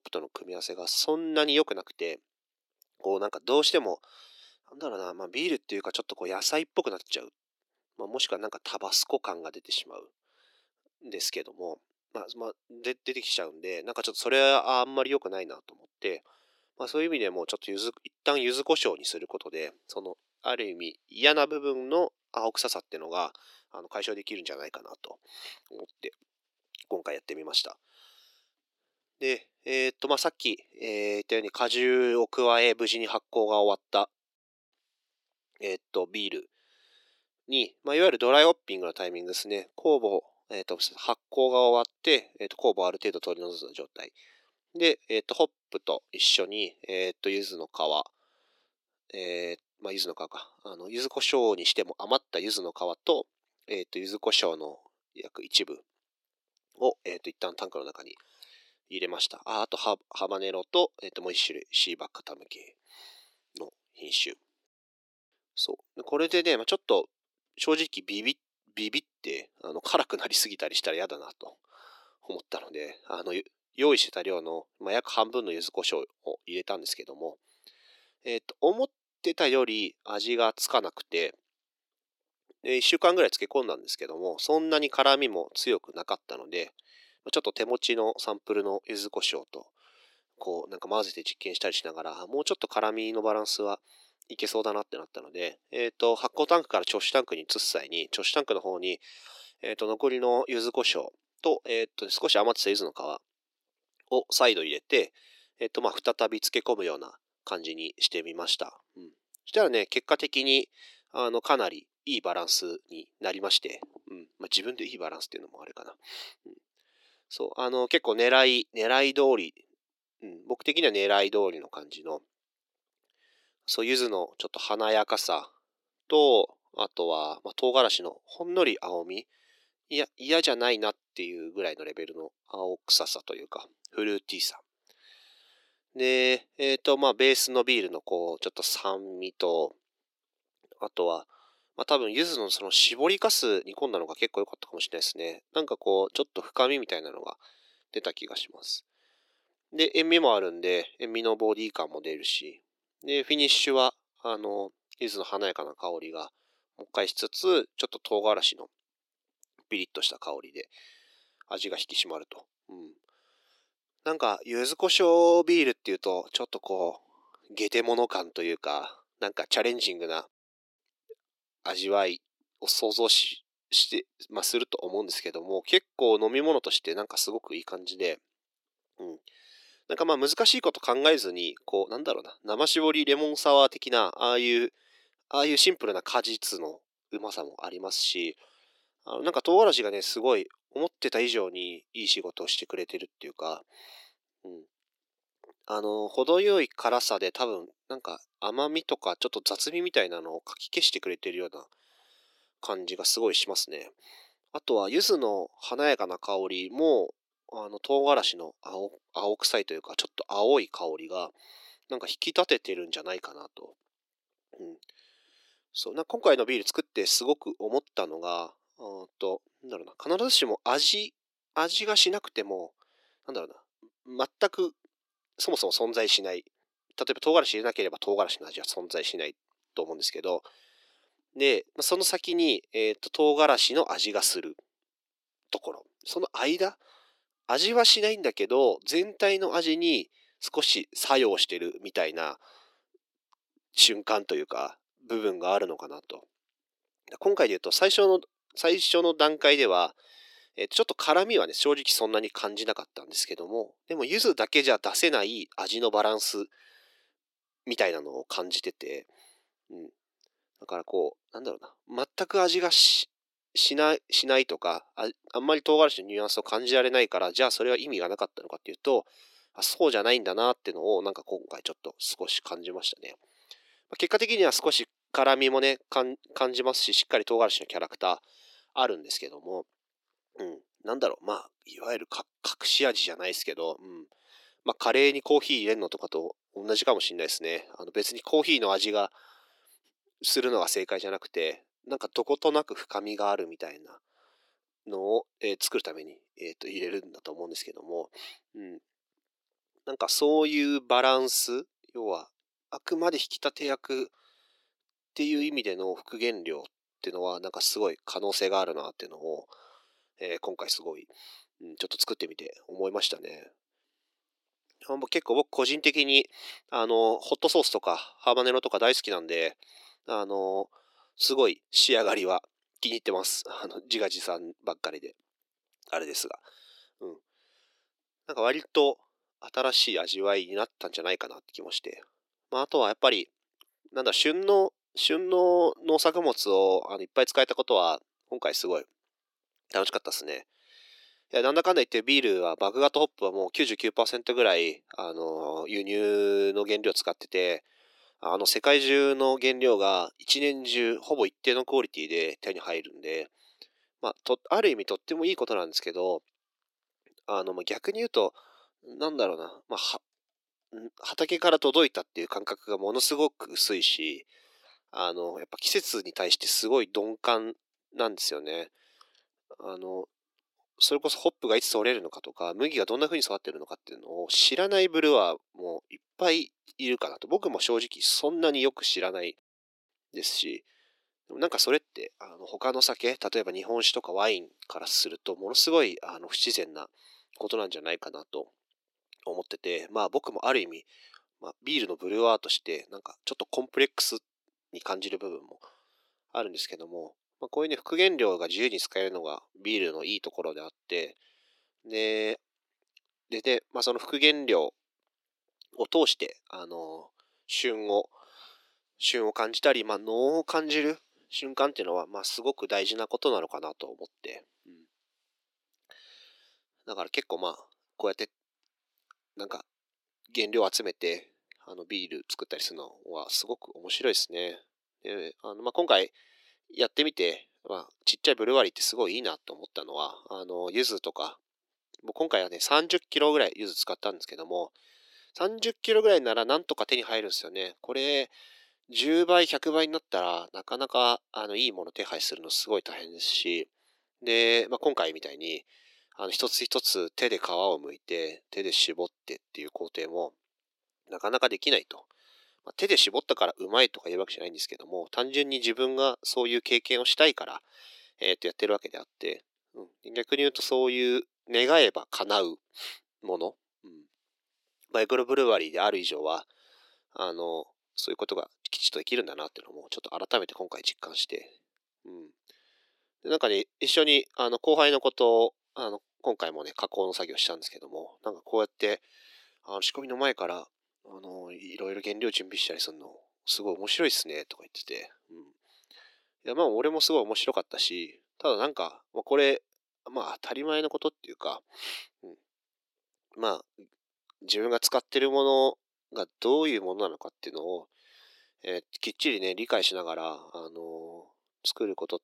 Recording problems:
thin; very; fading below 350 Hz

